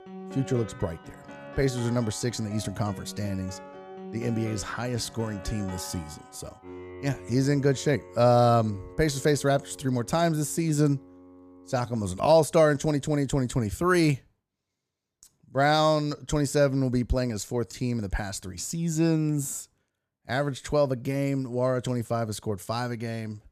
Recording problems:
background music; noticeable; until 12 s; 15 dB below the speech

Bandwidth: 15 kHz